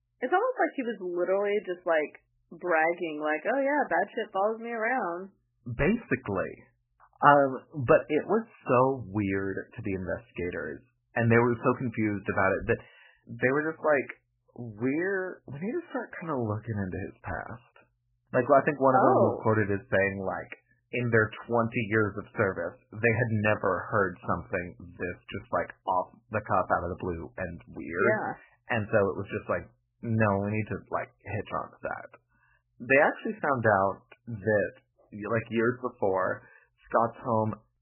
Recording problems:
garbled, watery; badly; nothing above 3 kHz

